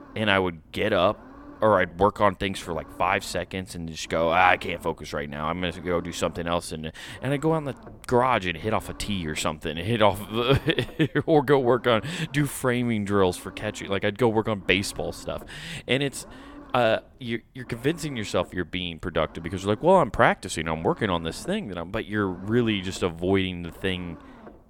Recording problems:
low rumble; faint; throughout; 25 dB below the speech

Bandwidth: 17.5 kHz